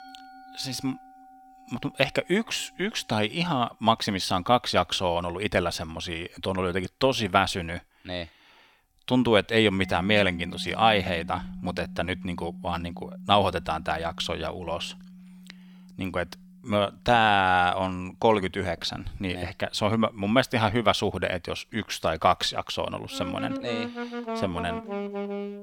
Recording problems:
background music; noticeable; throughout; 10 dB below the speech

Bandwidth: 17 kHz